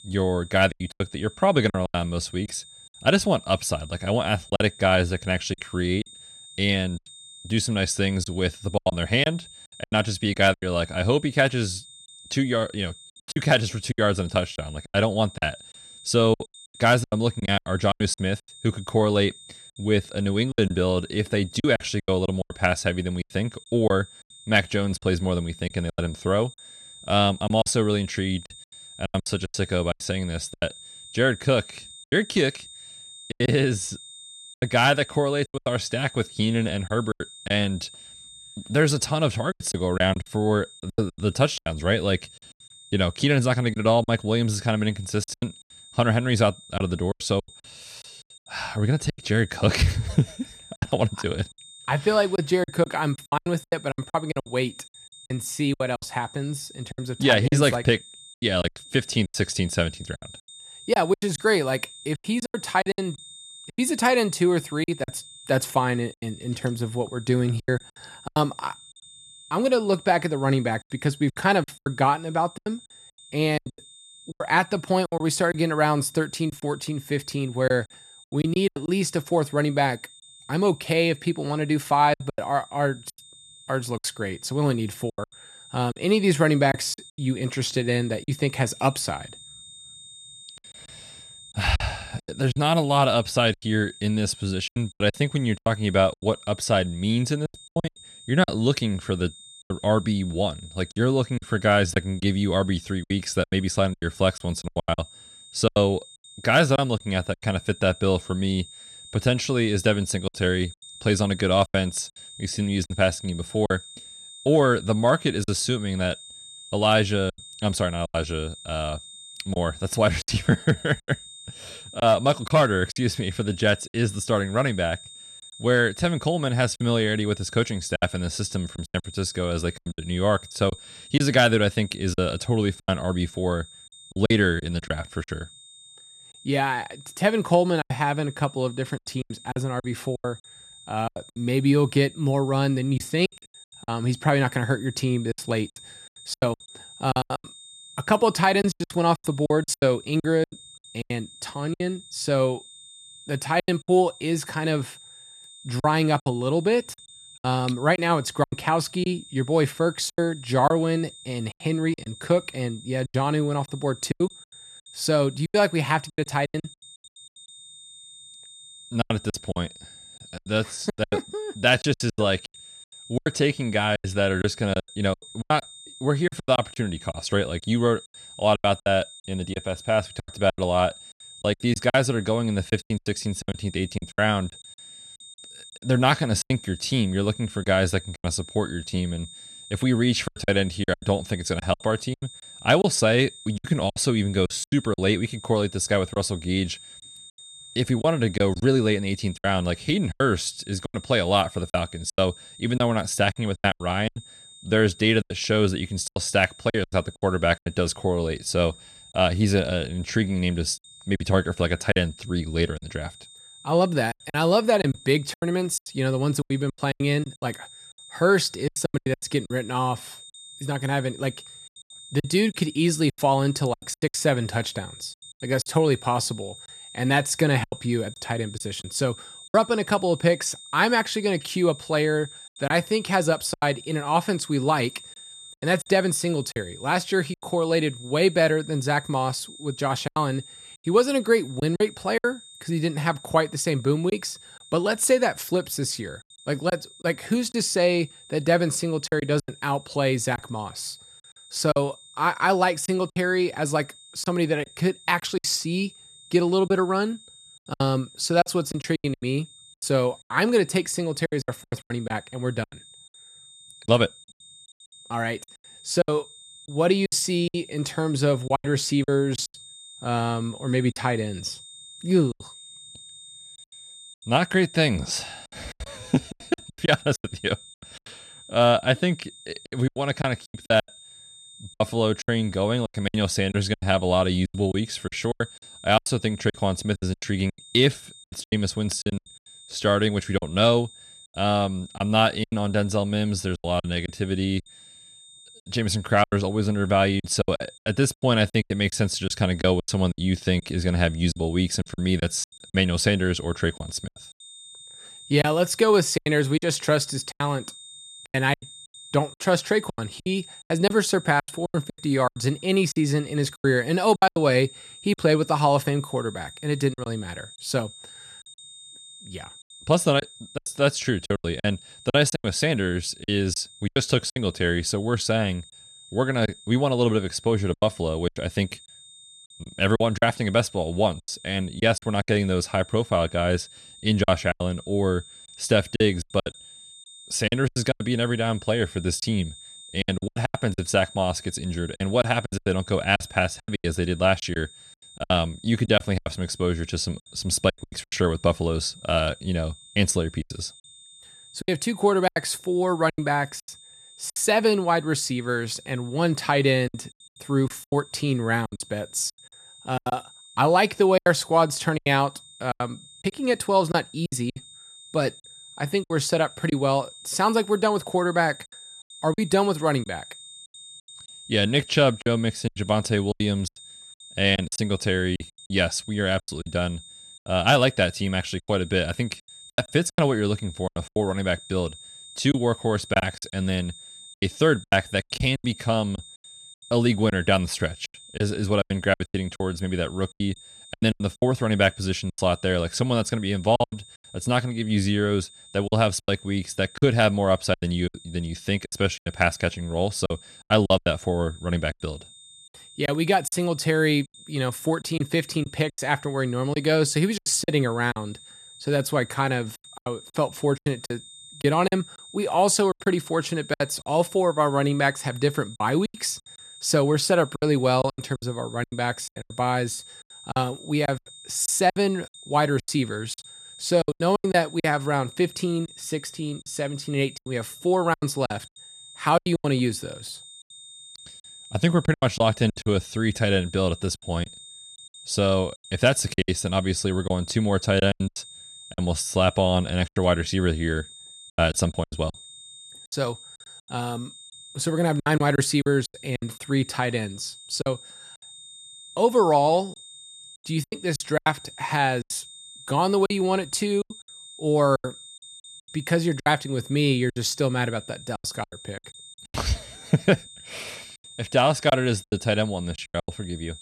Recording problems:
high-pitched whine; noticeable; throughout; 3.5 kHz, 20 dB below the speech
choppy; very; 11% of the speech affected

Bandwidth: 13.5 kHz